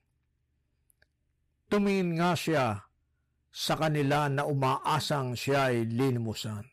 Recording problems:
distortion; heavy; 8% of the sound clipped

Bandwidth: 15 kHz